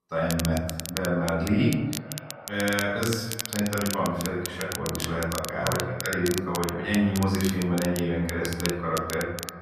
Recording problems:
off-mic speech; far
echo of what is said; noticeable; throughout; 480 ms later, 20 dB below the speech
room echo; noticeable; dies away in 0.8 s
crackle, like an old record; loud; 8 dB below the speech

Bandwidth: 14.5 kHz